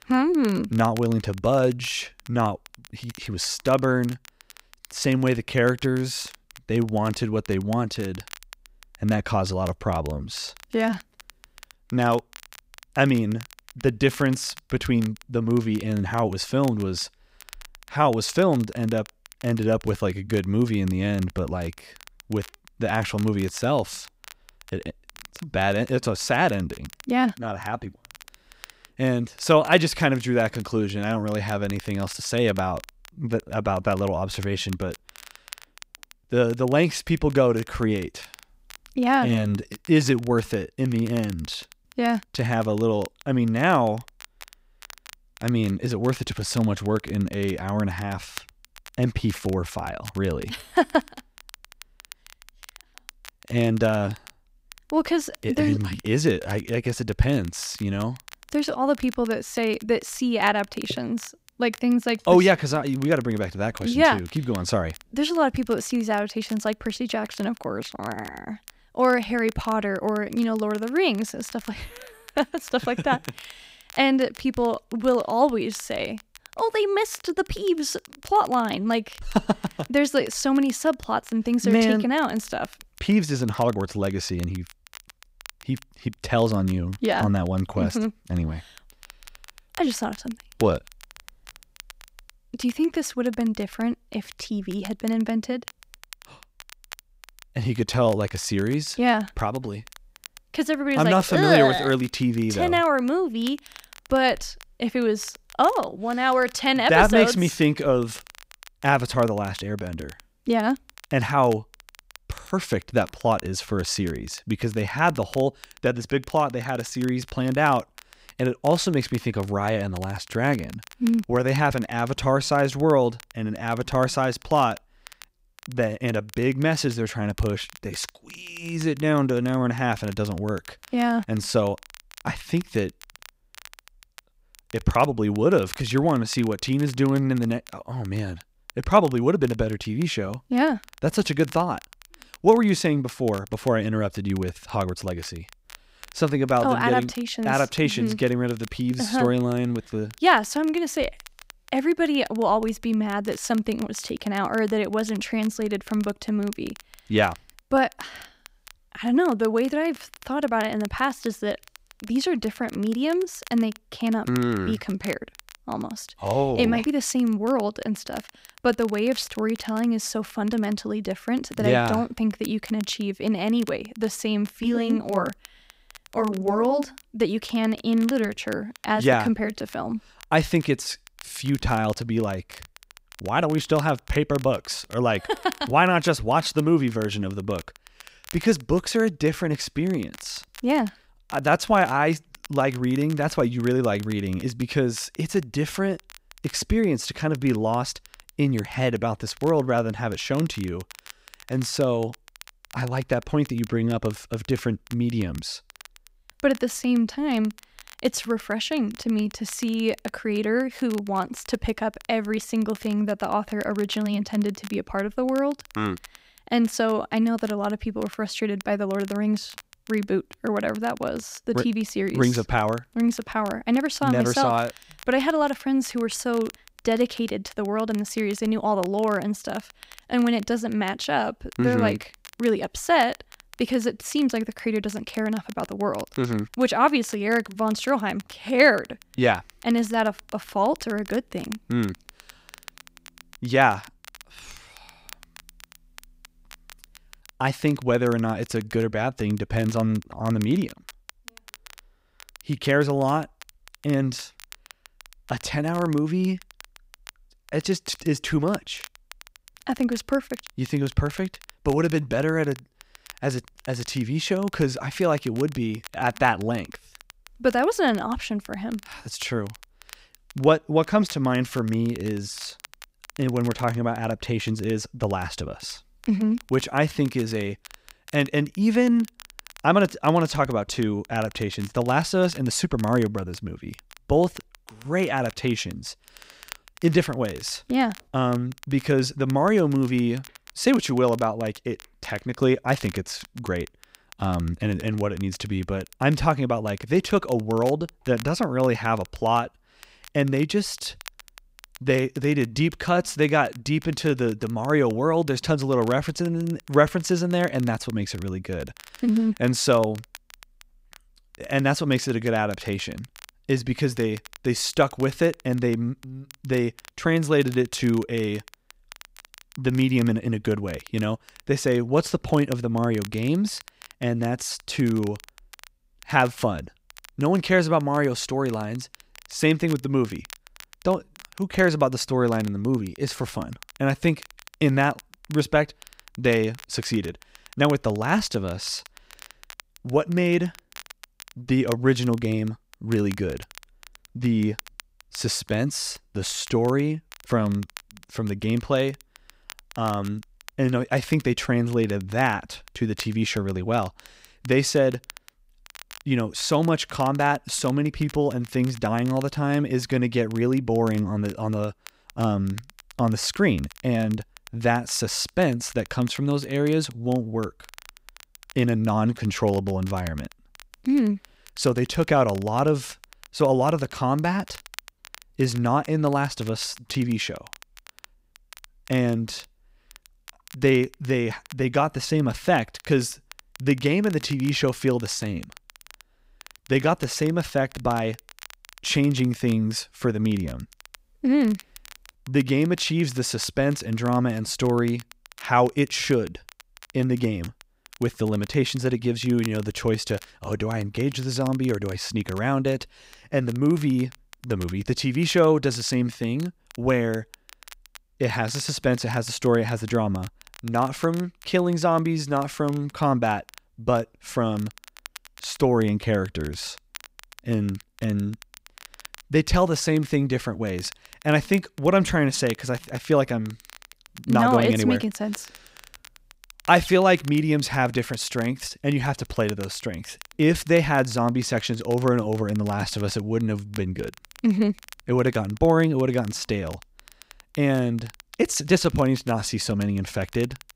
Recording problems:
crackle, like an old record; faint; 20 dB below the speech

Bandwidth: 15.5 kHz